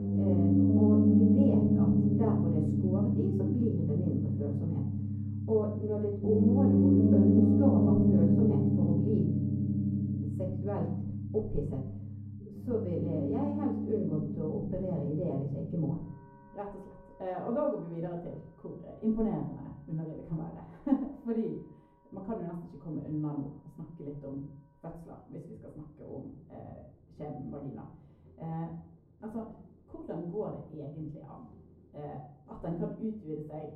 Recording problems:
off-mic speech; far
muffled; very; fading above 1 kHz
room echo; slight; dies away in 0.5 s
background music; very loud; throughout; 7 dB above the speech

